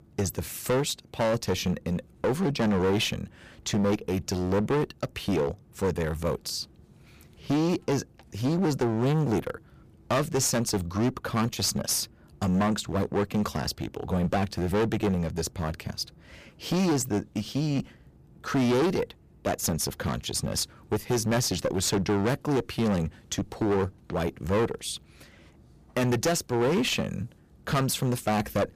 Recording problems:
distortion; heavy; 14% of the sound clipped

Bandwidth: 15 kHz